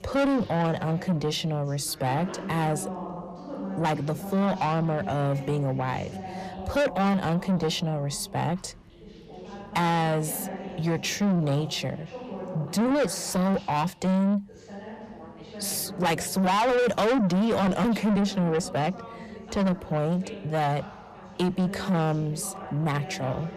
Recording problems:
distortion; heavy; 6 dB below the speech
background chatter; noticeable; throughout; 2 voices, 15 dB below the speech

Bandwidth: 14.5 kHz